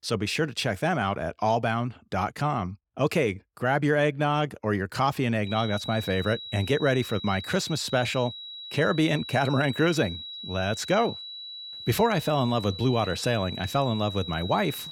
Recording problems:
high-pitched whine; noticeable; from 5.5 s on; 4 kHz, 10 dB below the speech

